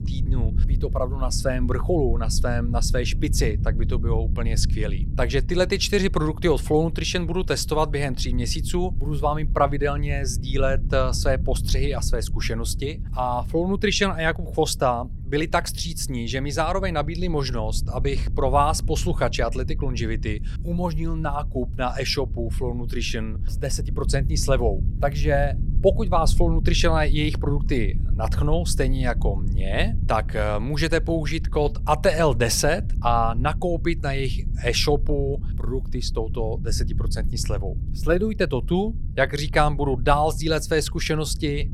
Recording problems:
low rumble; noticeable; throughout; 20 dB below the speech

